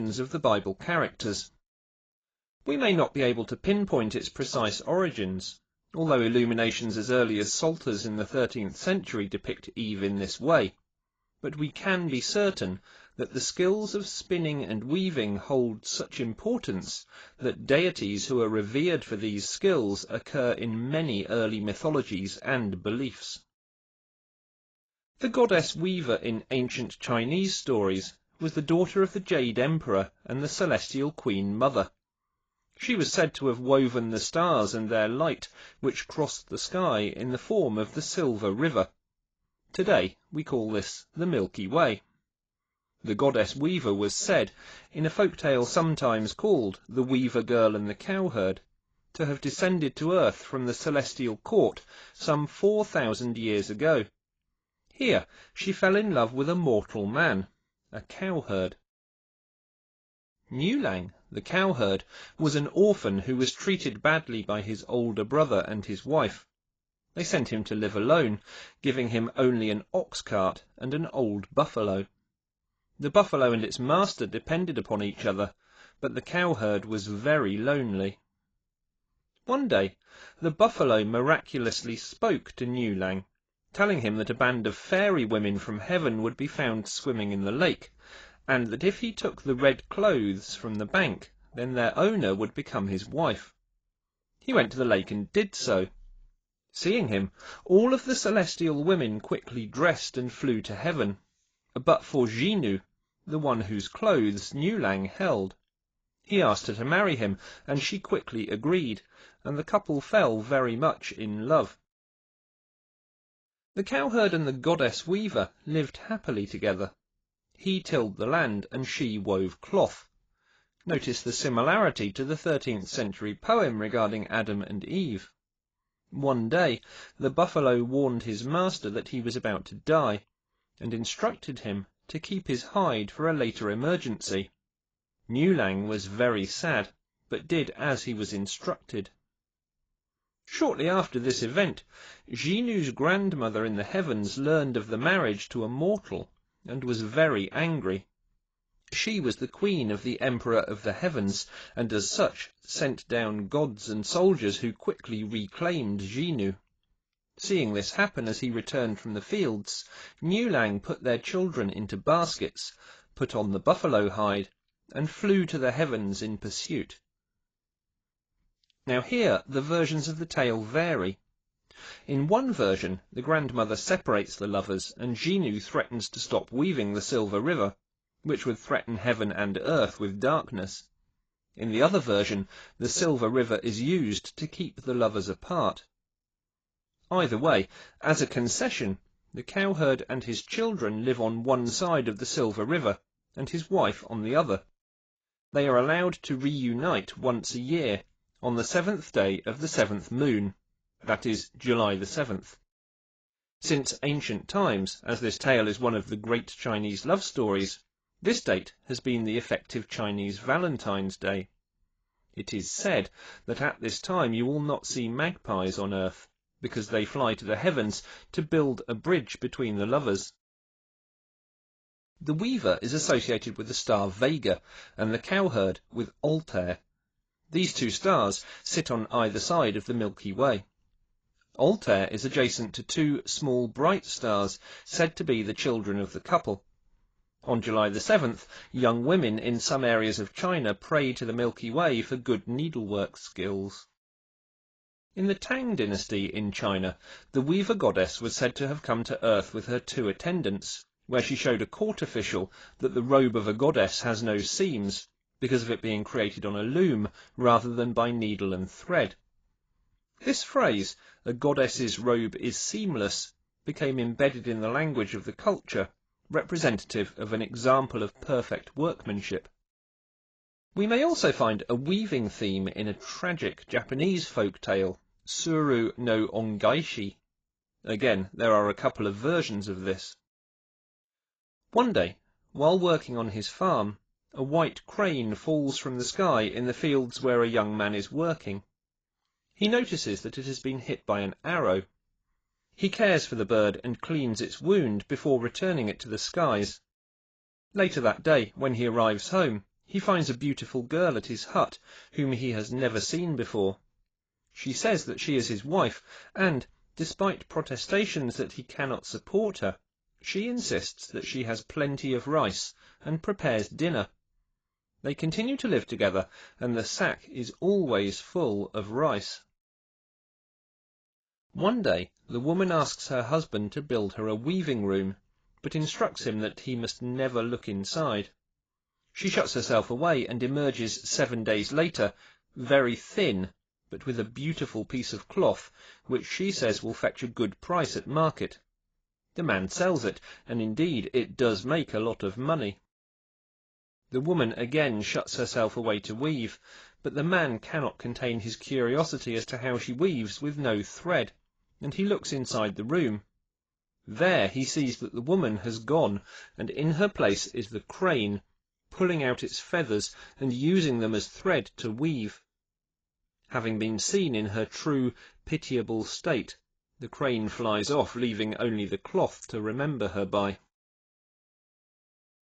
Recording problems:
garbled, watery; badly; nothing above 7.5 kHz
abrupt cut into speech; at the start

